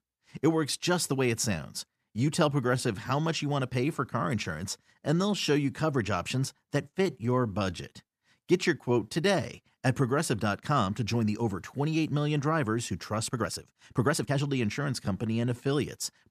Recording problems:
uneven, jittery; strongly; from 2 to 16 s

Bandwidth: 14.5 kHz